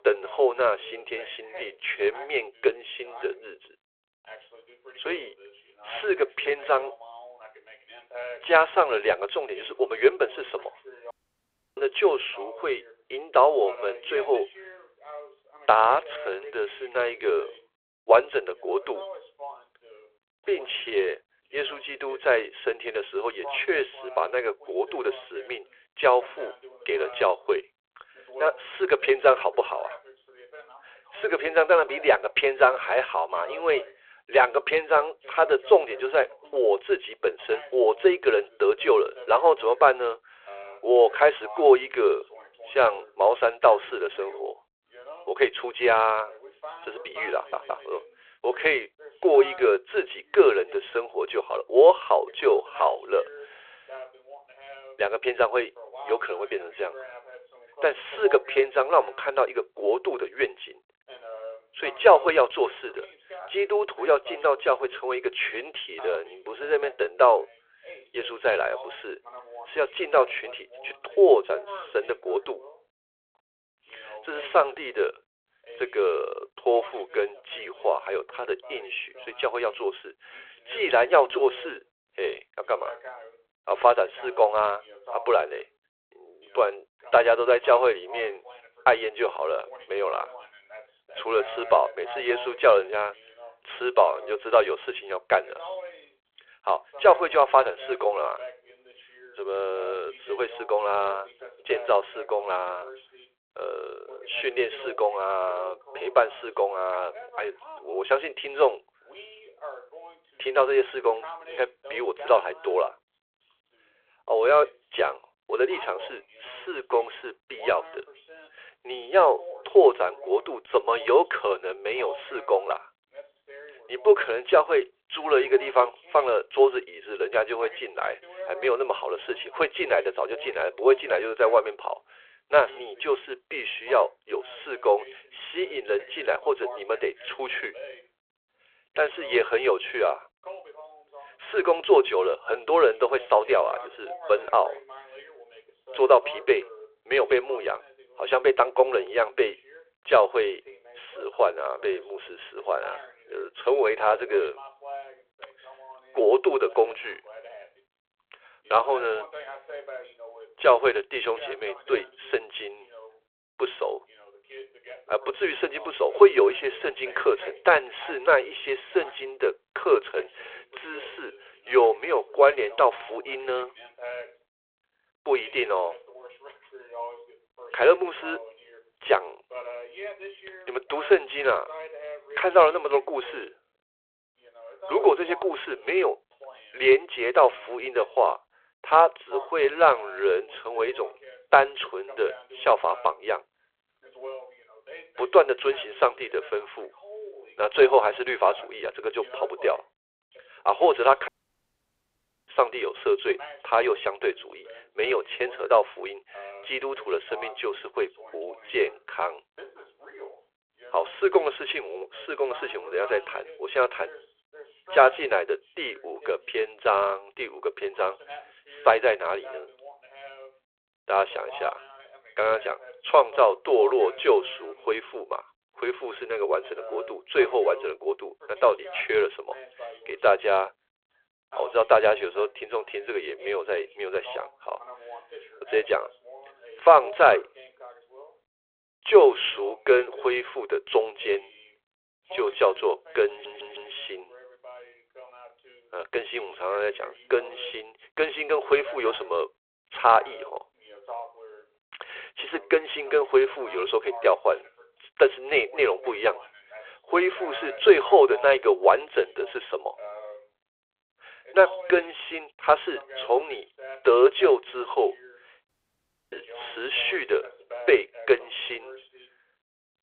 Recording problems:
phone-call audio
voice in the background; noticeable; throughout; 20 dB below the speech
audio cutting out; at 11 s for 0.5 s, at 3:21 for 1 s and at 4:26 for 0.5 s
audio stuttering; at 47 s and at 4:03

